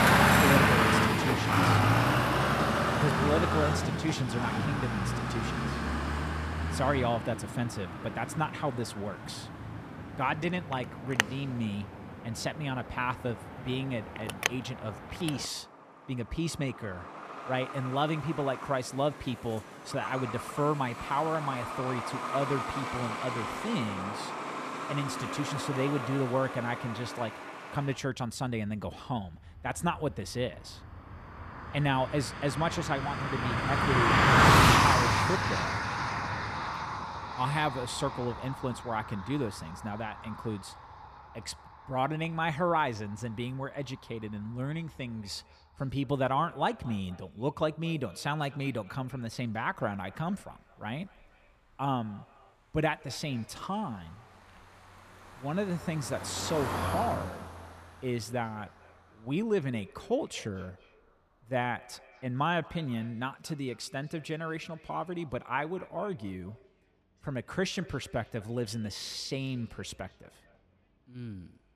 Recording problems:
echo of what is said; faint; from 45 s on; 230 ms later, 25 dB below the speech
traffic noise; very loud; throughout; 4 dB above the speech

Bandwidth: 14.5 kHz